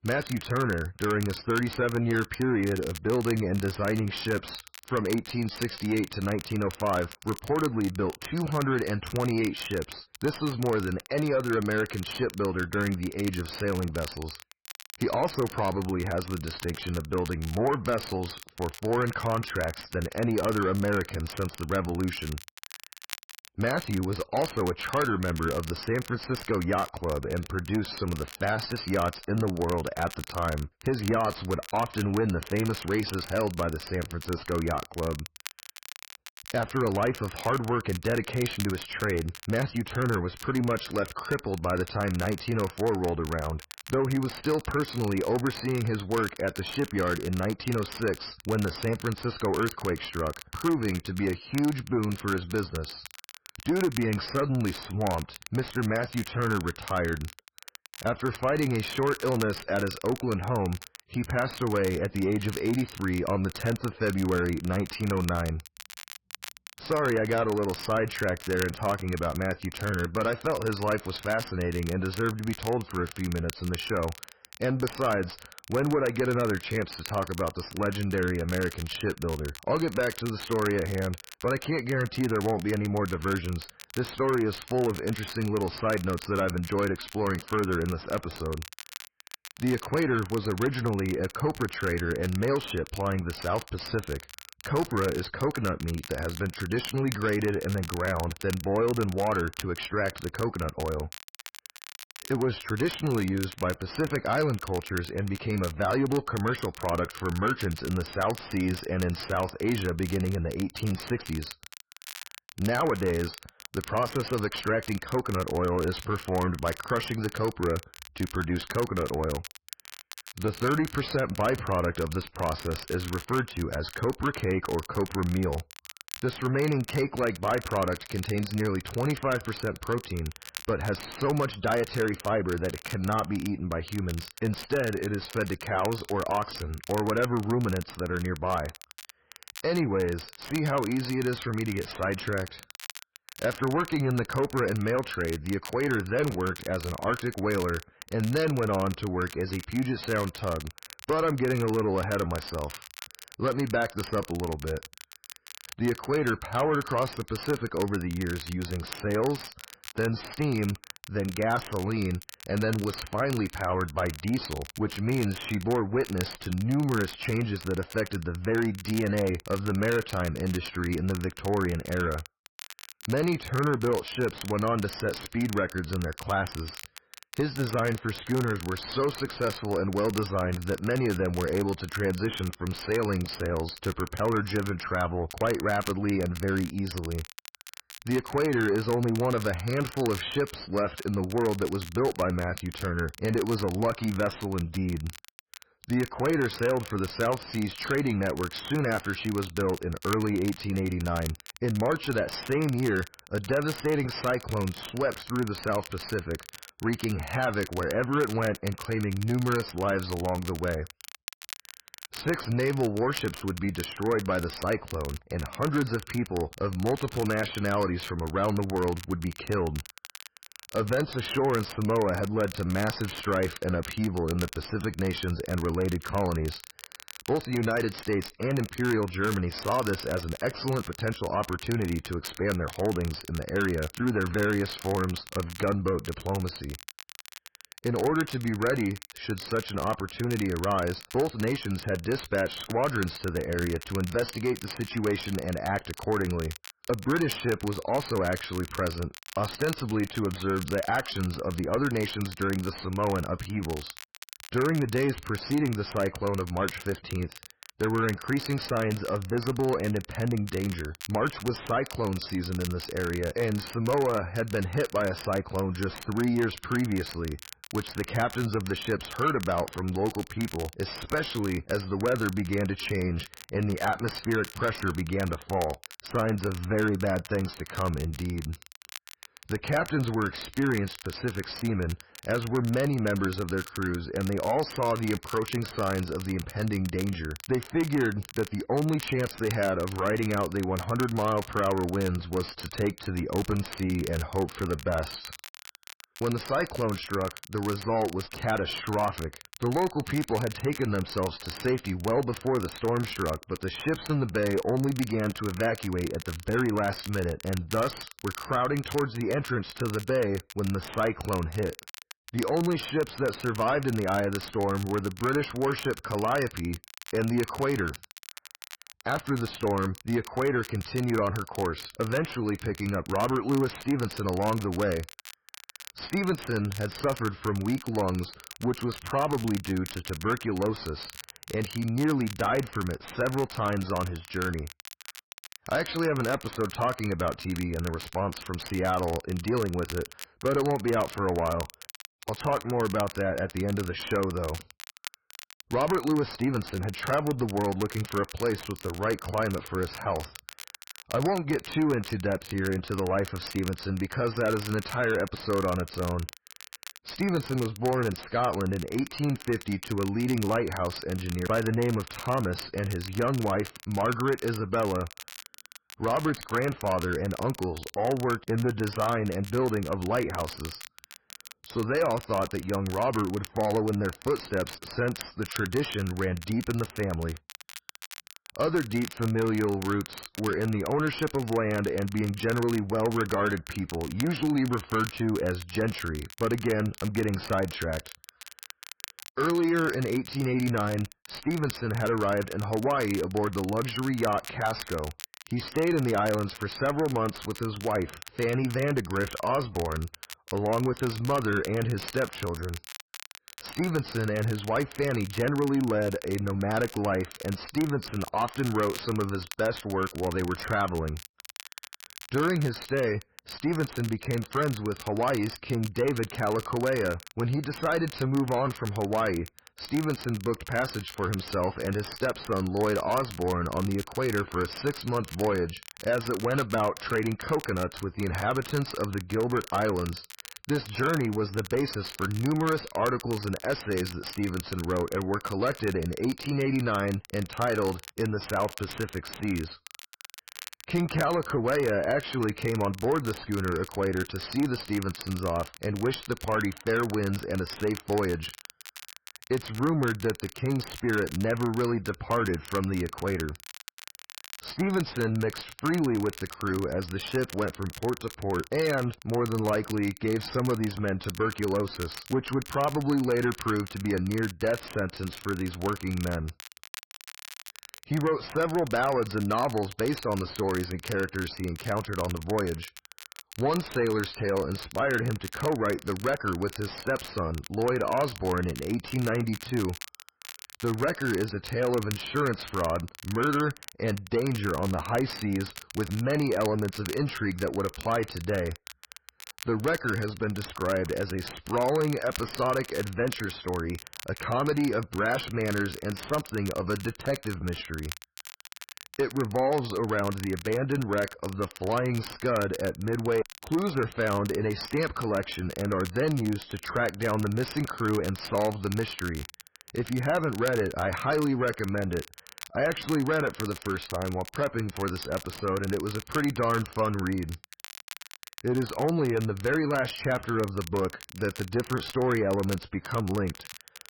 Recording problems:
garbled, watery; badly; nothing above 5.5 kHz
distortion; slight; 10 dB below the speech
crackle, like an old record; noticeable; 15 dB below the speech

